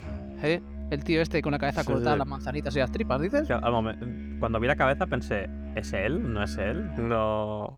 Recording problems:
background music; loud; throughout; 9 dB below the speech

